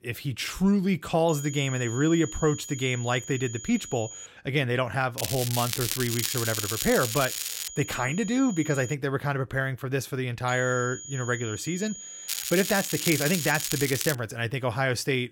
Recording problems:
crackling; loud; from 5 to 7.5 s and from 12 to 14 s; 3 dB below the speech
high-pitched whine; noticeable; from 1.5 to 4.5 s, from 6 to 9 s and from 10 to 14 s; 7 kHz, 10 dB below the speech

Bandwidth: 16.5 kHz